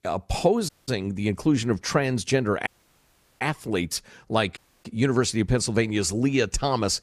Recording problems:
audio cutting out; at 0.5 s, at 2.5 s for 0.5 s and at 4.5 s

